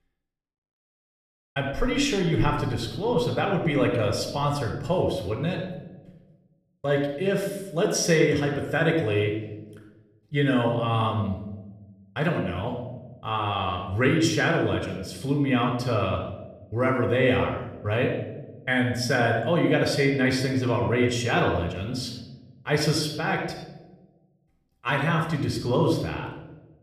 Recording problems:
room echo; noticeable; dies away in 0.9 s
off-mic speech; somewhat distant

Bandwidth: 14.5 kHz